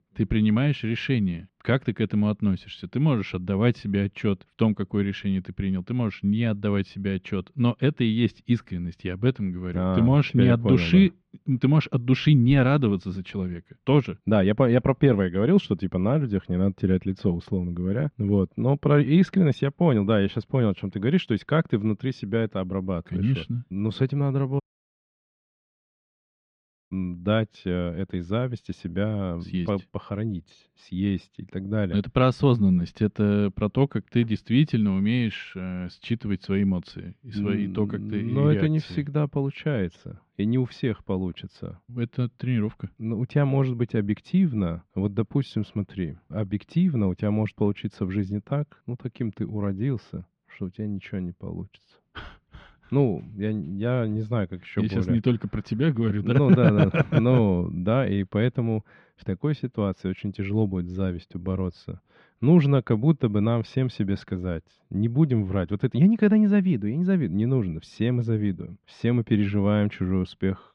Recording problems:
muffled; slightly; fading above 3 kHz
audio cutting out; at 25 s for 2.5 s

